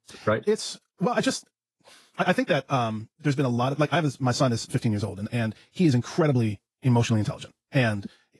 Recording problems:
wrong speed, natural pitch; too fast; 1.7 times normal speed
garbled, watery; slightly

